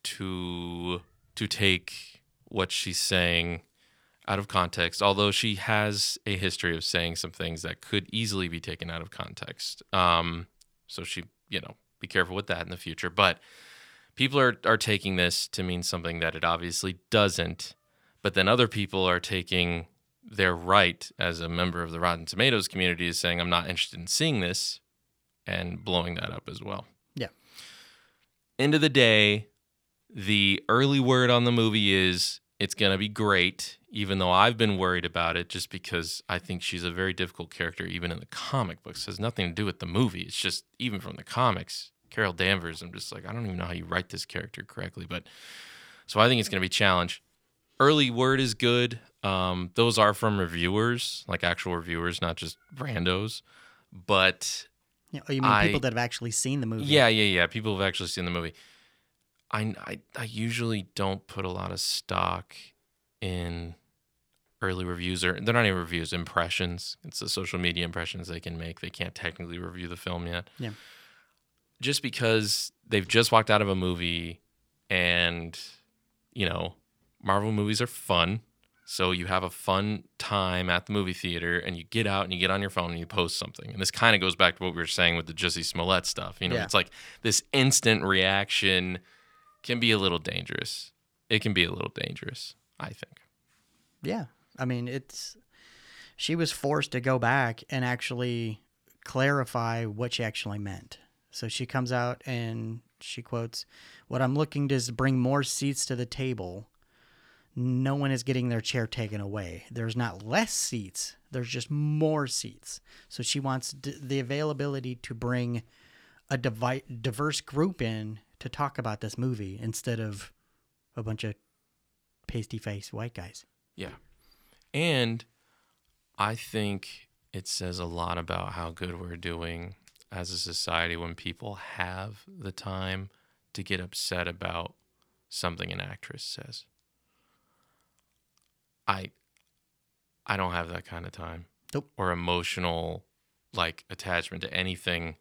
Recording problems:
none

